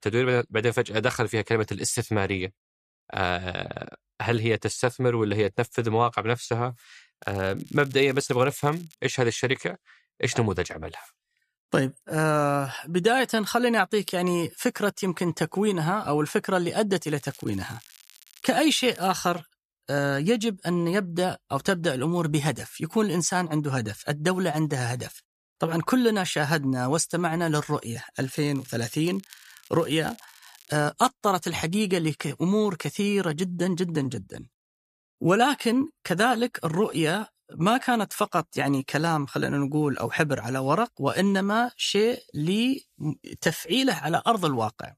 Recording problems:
crackling; faint; from 7 to 9 s, from 17 to 19 s and from 28 to 31 s; 25 dB below the speech

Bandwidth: 14.5 kHz